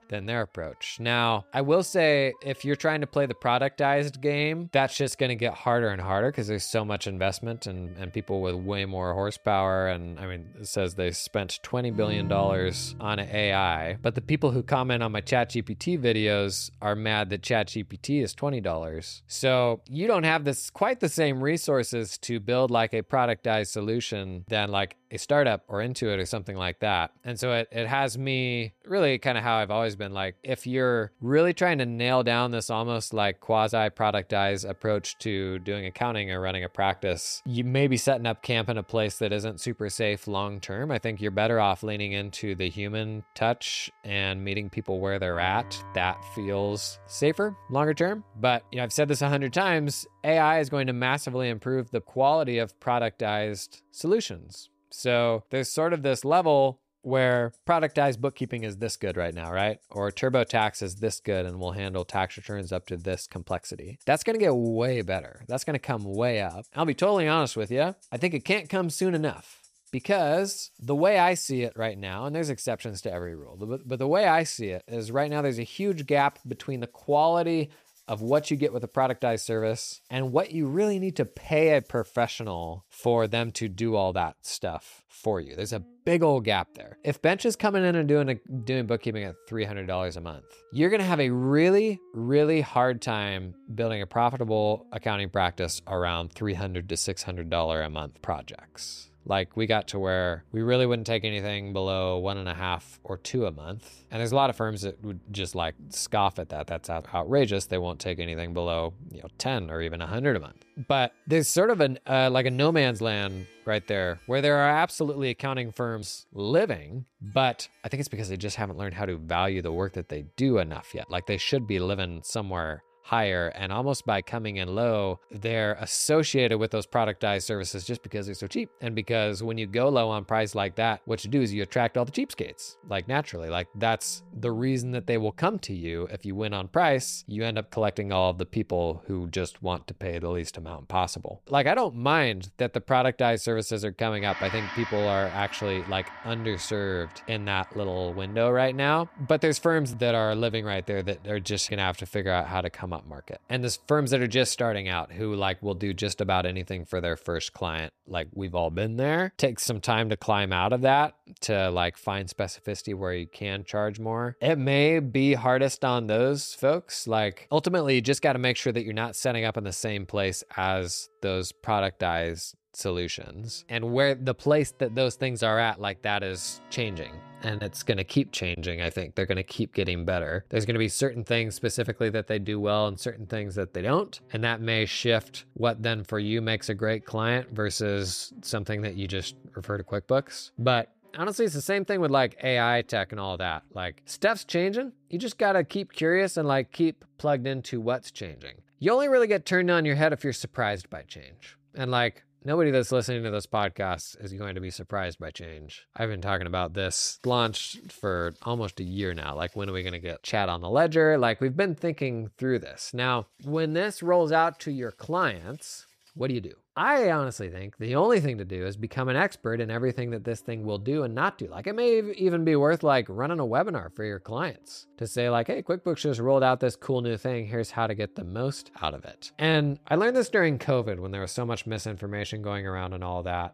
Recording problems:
background music; faint; throughout; 25 dB below the speech

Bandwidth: 14.5 kHz